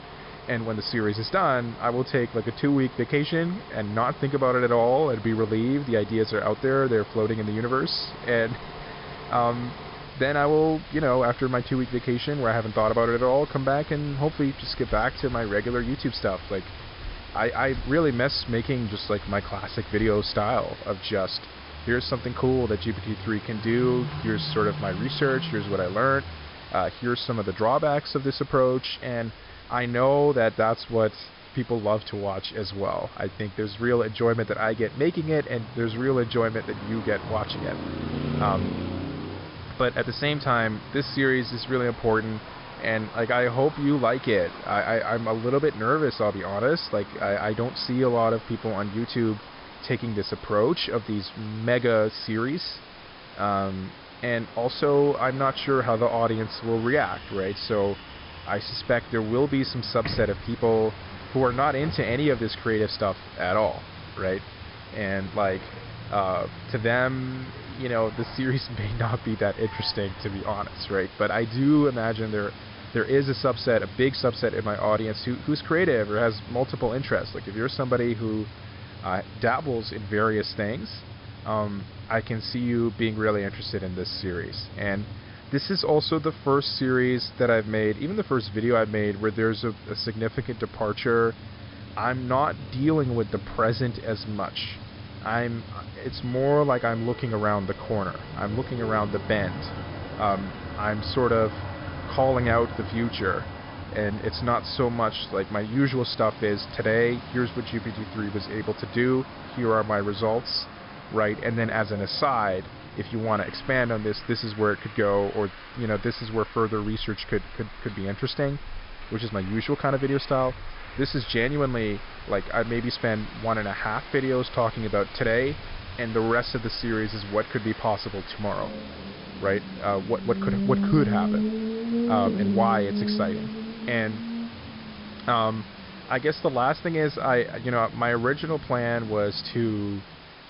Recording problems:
high frequencies cut off; noticeable; nothing above 5.5 kHz
traffic noise; noticeable; throughout; 10 dB below the speech
hiss; noticeable; throughout; 20 dB below the speech

